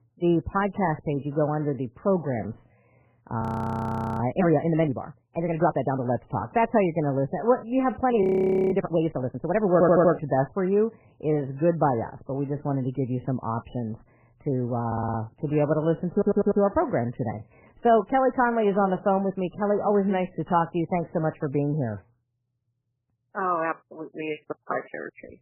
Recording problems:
garbled, watery; badly; nothing above 15.5 kHz
muffled; very; fading above 2 kHz
audio freezing; at 3.5 s for 1 s and at 8 s
audio stuttering; at 9.5 s, at 15 s and at 16 s

